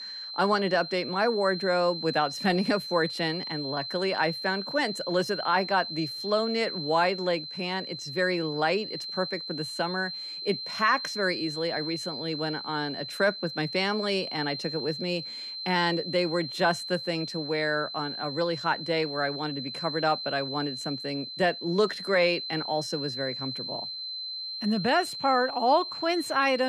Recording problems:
high-pitched whine; loud; throughout; 4 kHz, 6 dB below the speech
abrupt cut into speech; at the end

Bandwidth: 15 kHz